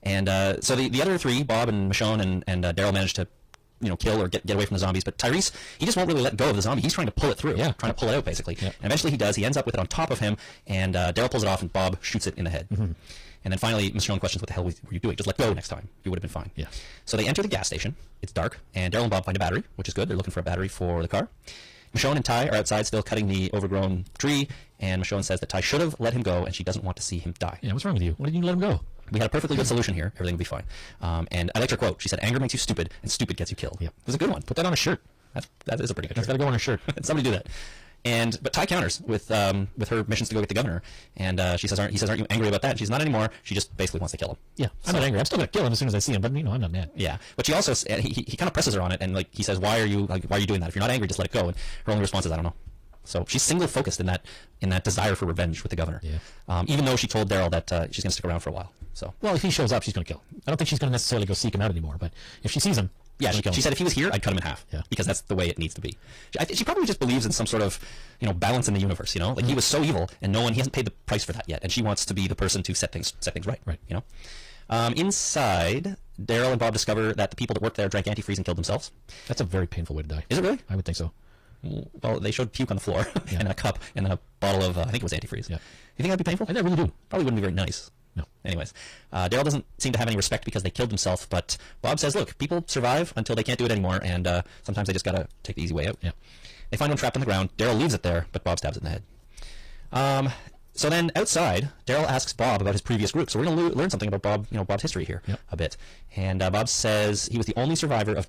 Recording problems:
distortion; heavy; 6 dB below the speech
wrong speed, natural pitch; too fast; 1.7 times normal speed
garbled, watery; slightly; nothing above 15 kHz

